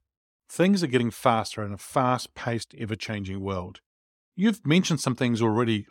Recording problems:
none

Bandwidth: 17 kHz